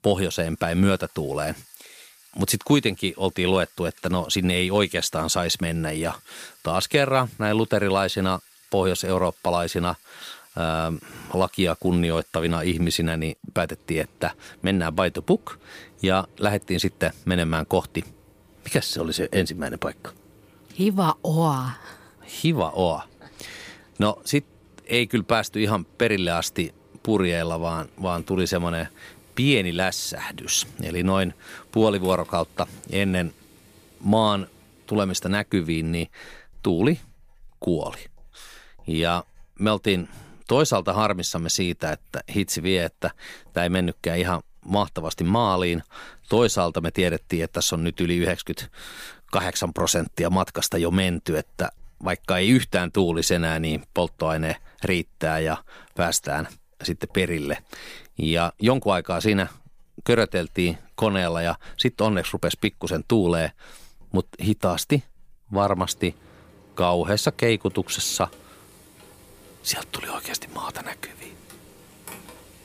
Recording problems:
household noises; faint; throughout; 30 dB below the speech

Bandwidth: 15 kHz